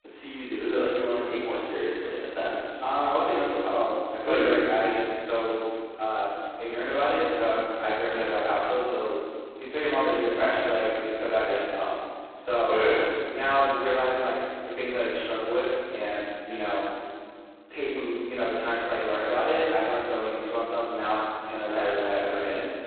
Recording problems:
phone-call audio; poor line; nothing above 4 kHz
room echo; strong; dies away in 2.1 s
off-mic speech; far

